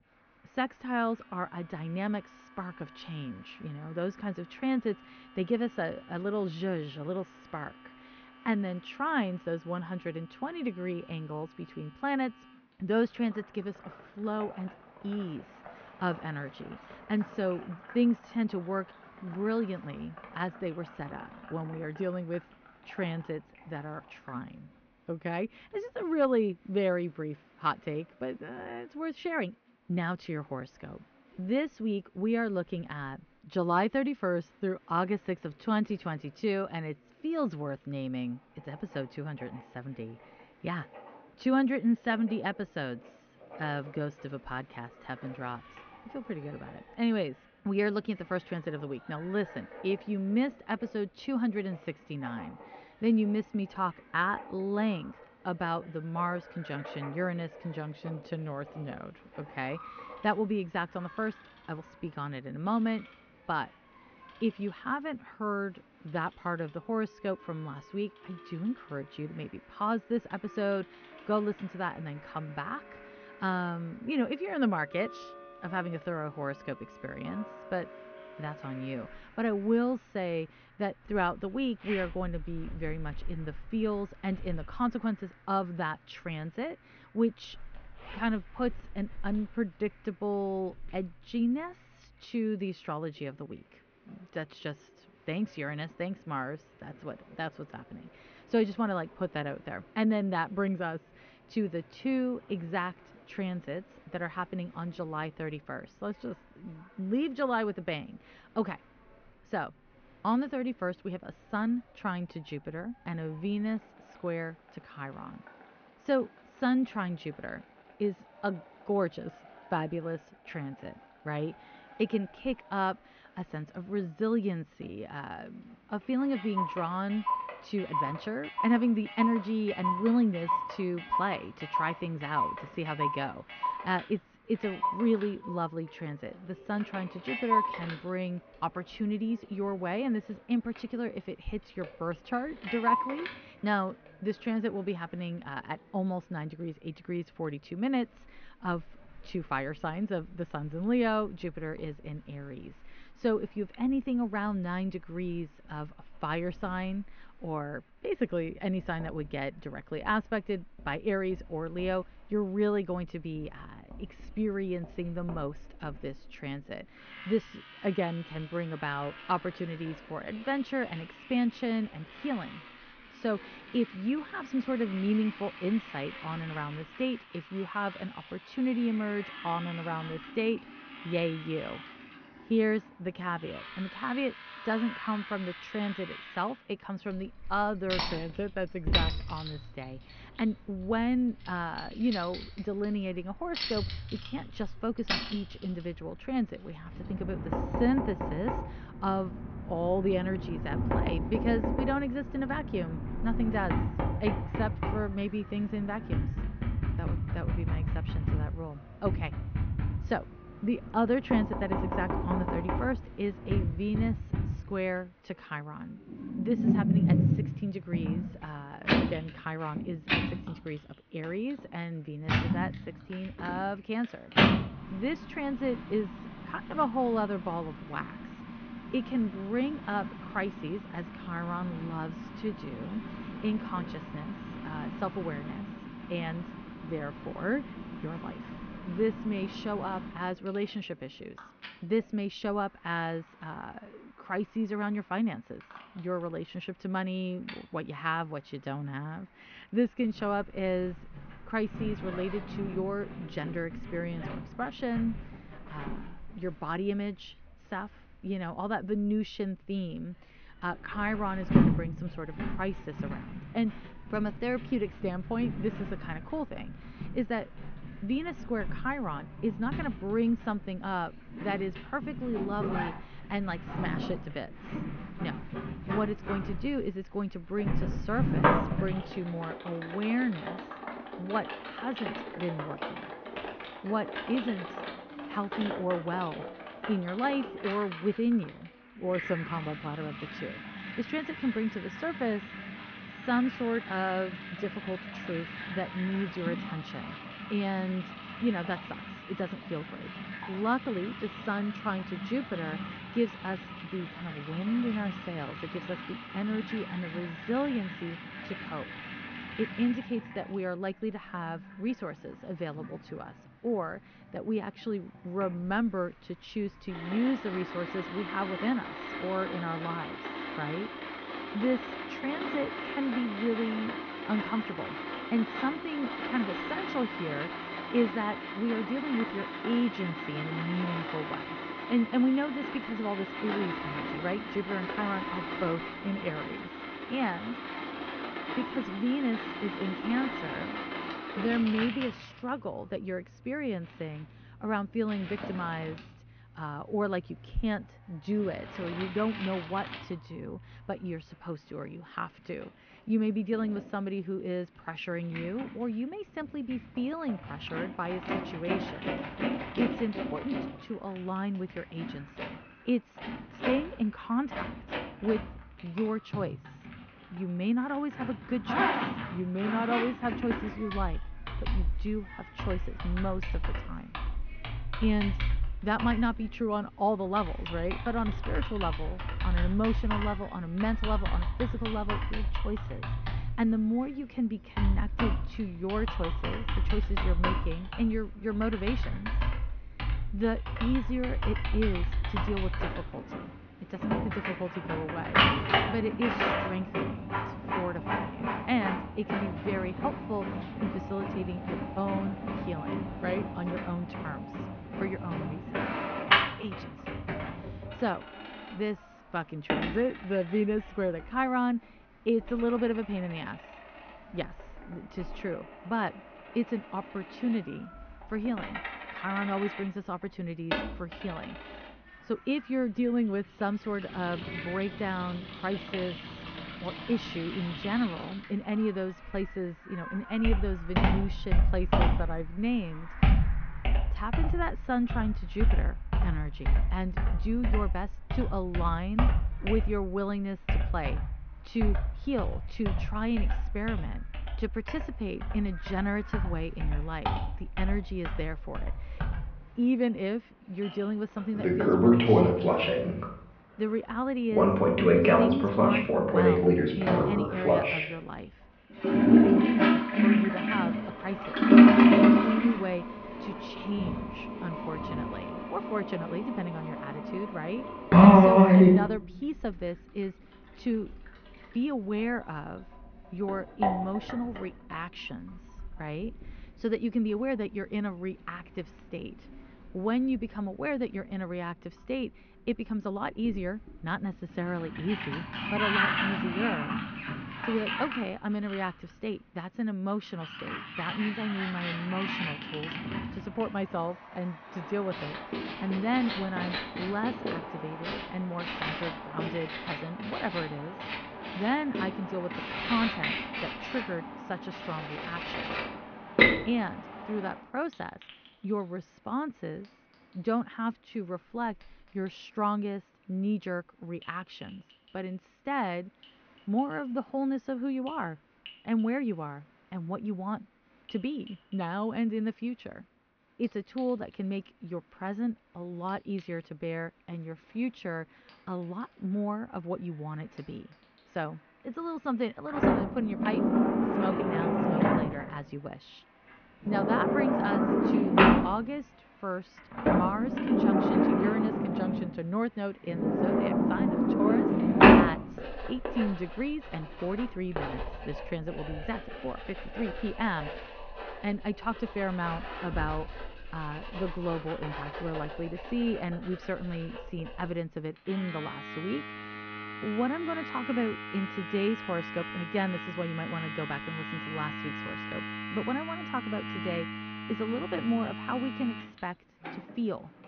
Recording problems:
high frequencies cut off; noticeable; nothing above 6.5 kHz
muffled; very slightly; fading above 2.5 kHz
household noises; very loud; throughout; 2 dB above the speech
crowd noise; faint; throughout; 25 dB below the speech

